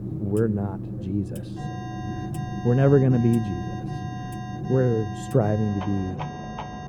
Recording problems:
muffled; very; fading above 1 kHz
household noises; noticeable; throughout; 10 dB below the speech
background chatter; faint; throughout; 3 voices, 25 dB below the speech
alarm; faint; from 1.5 s on; peak 10 dB below the speech

